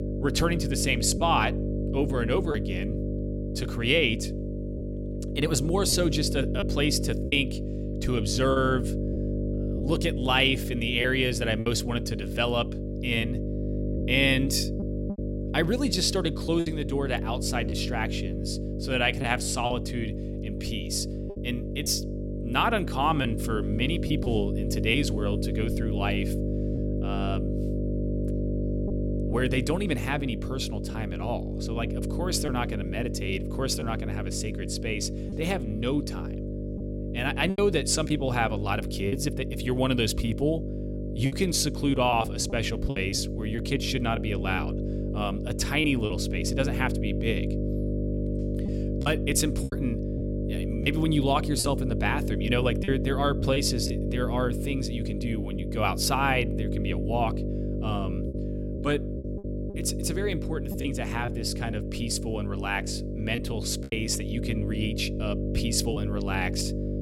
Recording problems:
electrical hum; loud; throughout; 50 Hz, 9 dB below the speech
choppy; occasionally; 3% of the speech affected

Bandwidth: 16 kHz